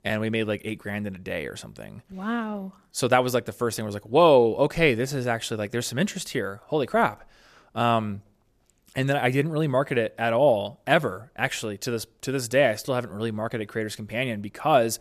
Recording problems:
none

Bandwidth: 14.5 kHz